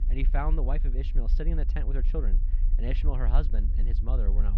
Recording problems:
muffled; slightly; fading above 3.5 kHz
low rumble; noticeable; throughout; 10 dB below the speech
electrical hum; faint; throughout; 50 Hz, 25 dB below the speech
abrupt cut into speech; at the end

